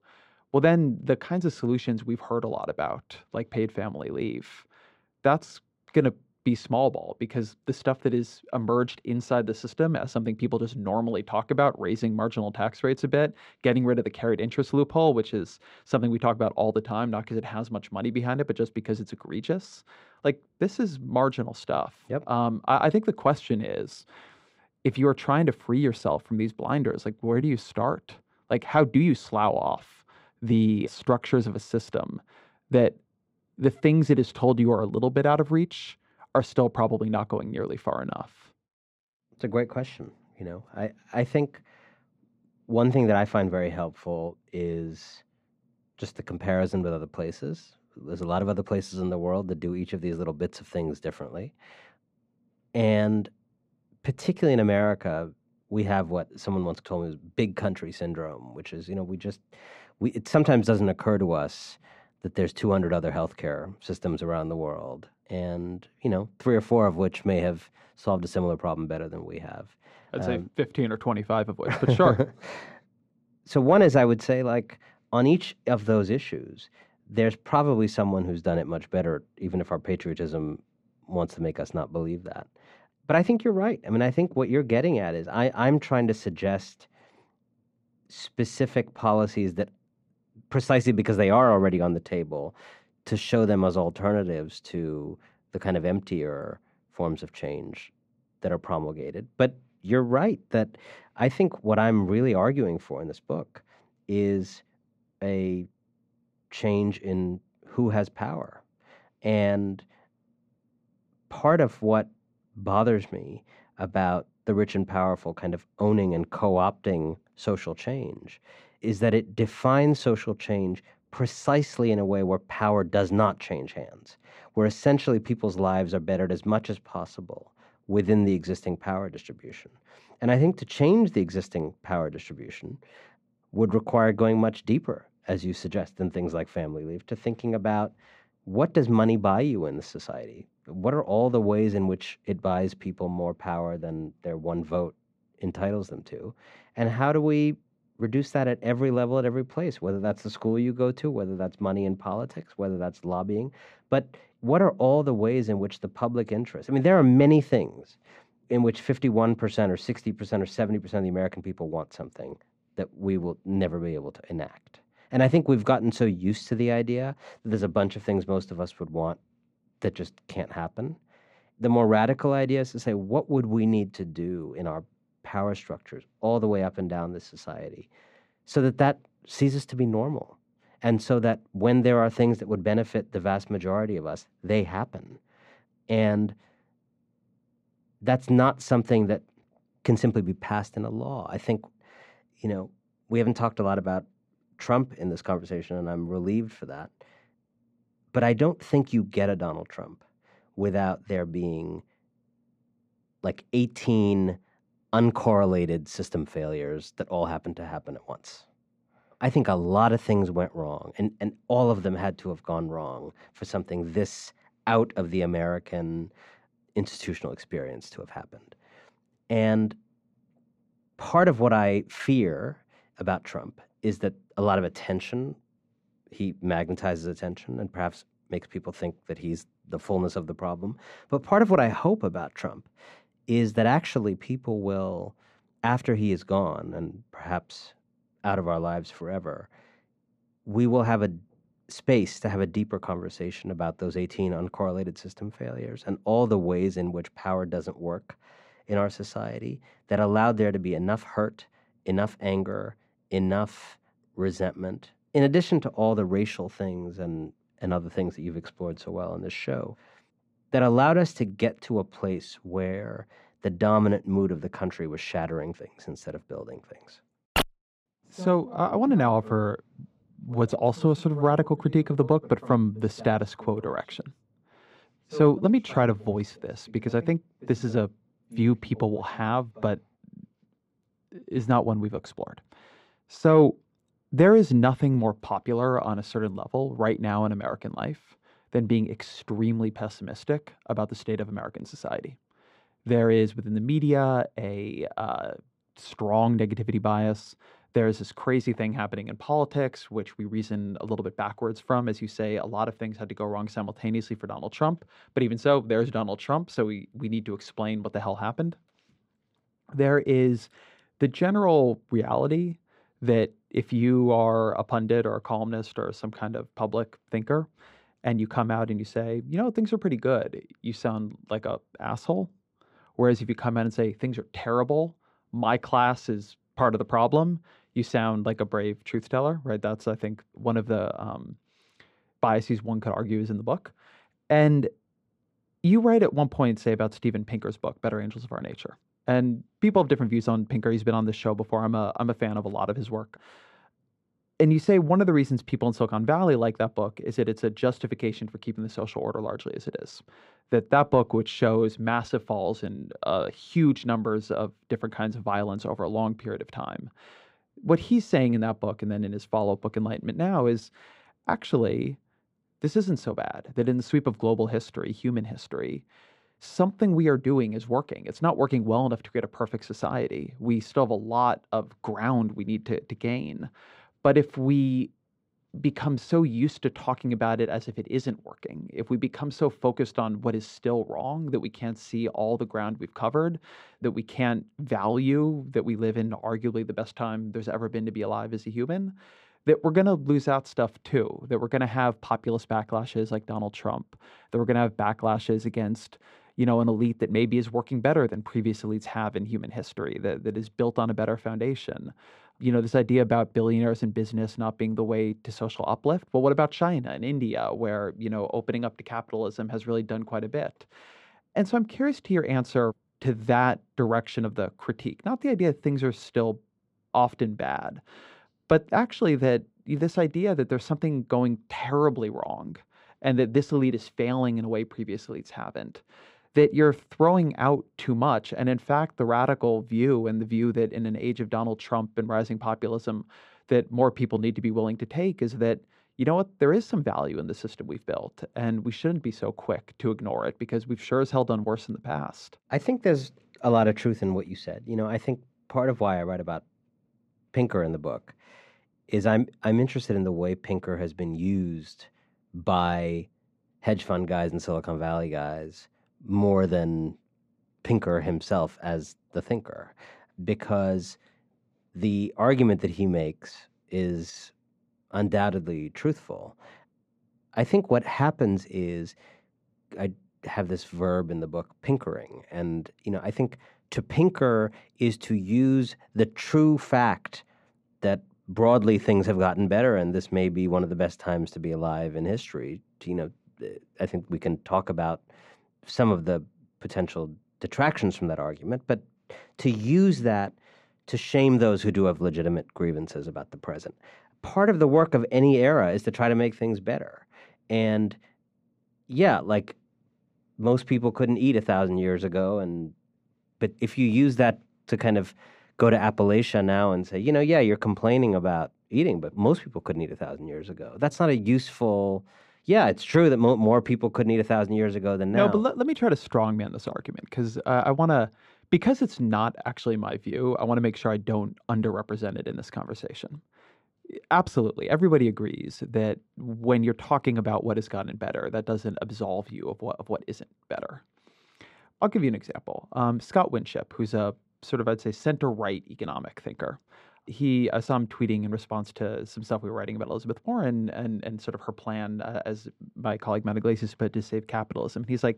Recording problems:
muffled; slightly; fading above 4 kHz

